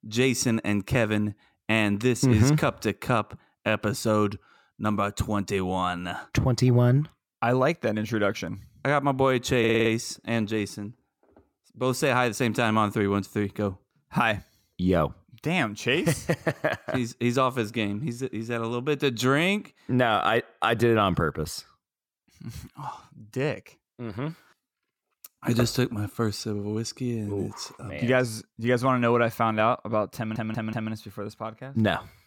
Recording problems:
audio stuttering; at 9.5 s and at 30 s

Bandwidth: 17 kHz